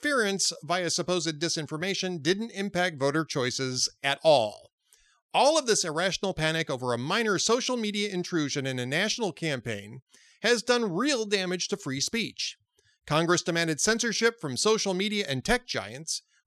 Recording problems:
none

